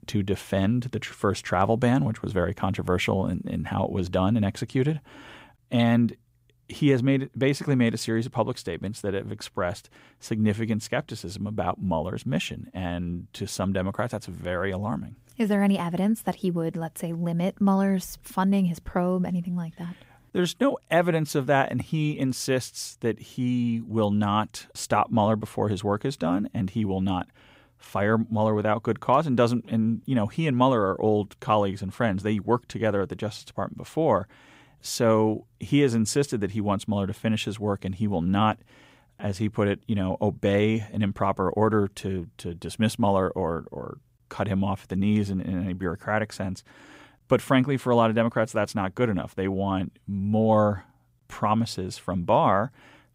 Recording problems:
none

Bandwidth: 15.5 kHz